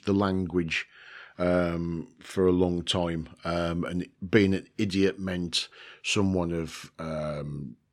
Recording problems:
none

